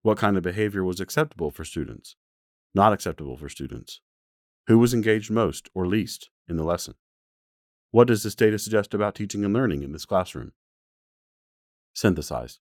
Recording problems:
none

